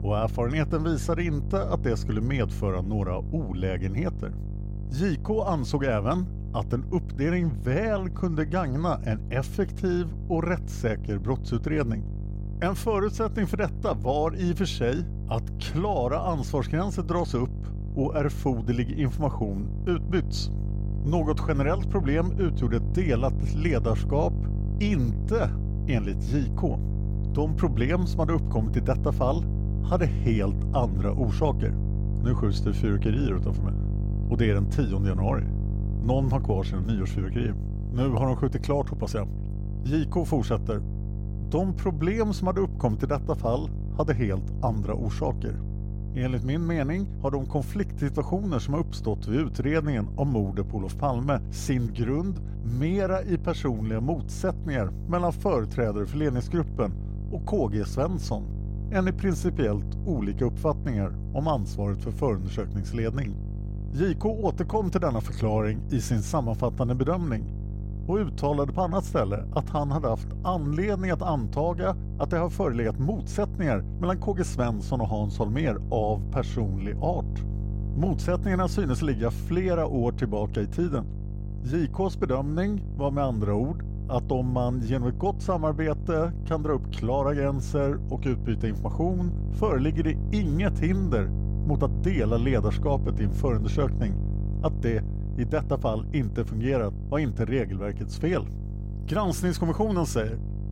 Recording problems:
electrical hum; noticeable; throughout; 50 Hz, 15 dB below the speech

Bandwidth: 16 kHz